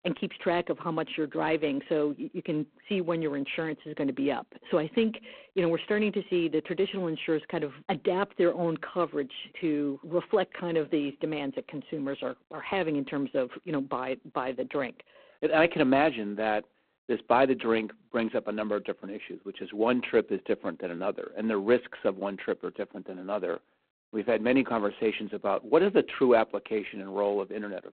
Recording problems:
phone-call audio; poor line

